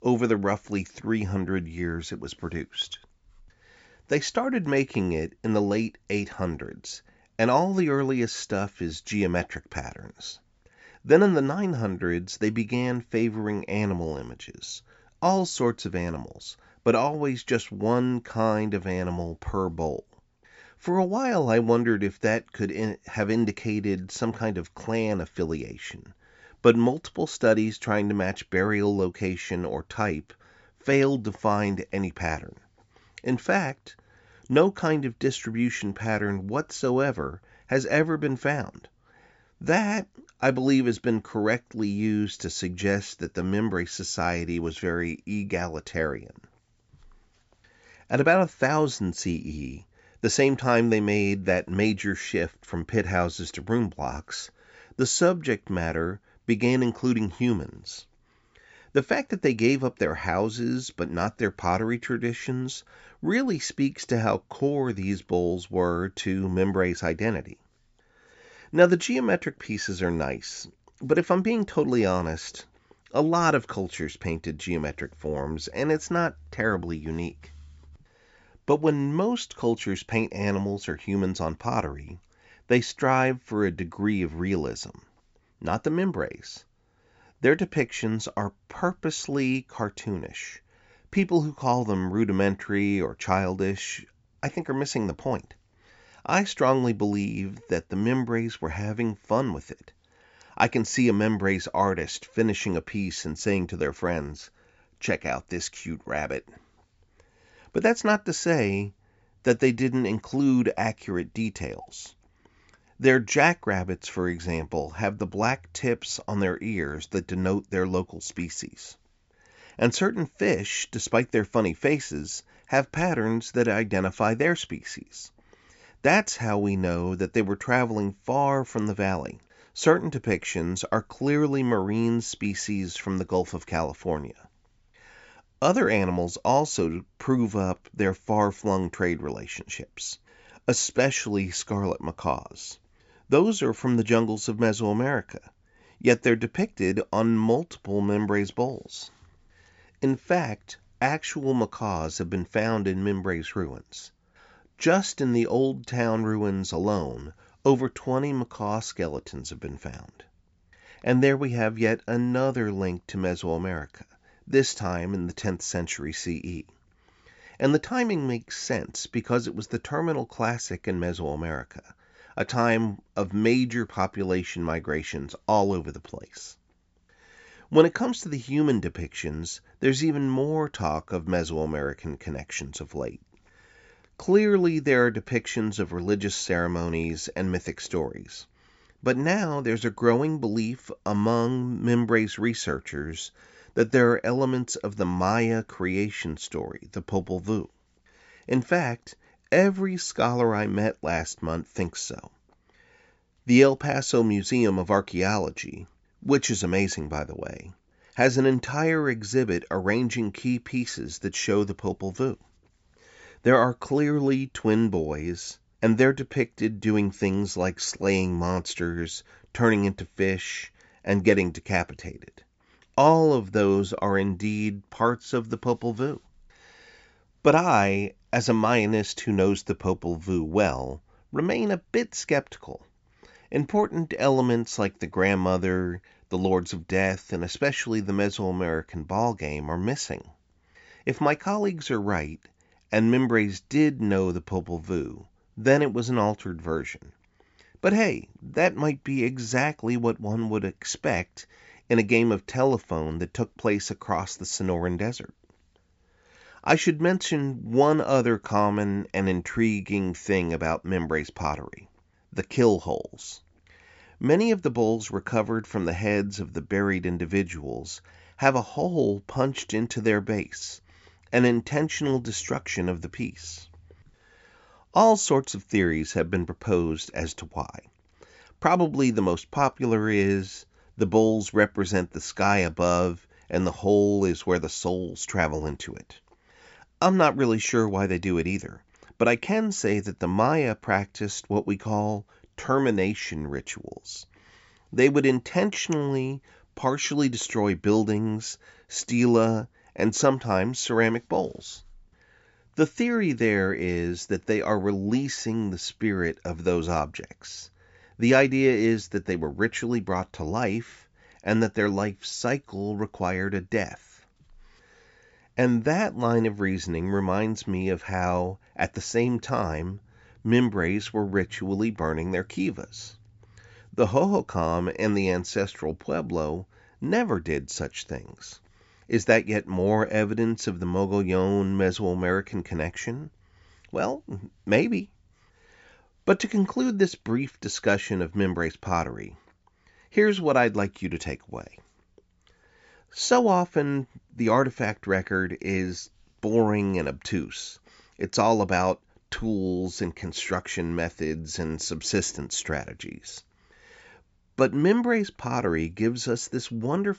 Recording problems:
high frequencies cut off; noticeable; nothing above 8 kHz

